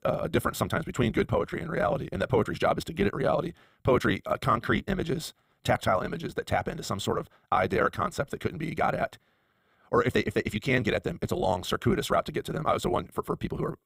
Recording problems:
wrong speed, natural pitch; too fast; 1.6 times normal speed

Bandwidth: 15.5 kHz